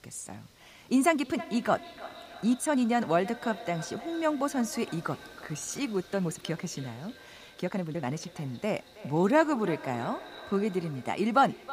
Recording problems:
echo of what is said; noticeable; throughout; 320 ms later, 15 dB below the speech
hiss; faint; throughout; 30 dB below the speech
uneven, jittery; strongly; from 1 to 11 s

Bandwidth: 15 kHz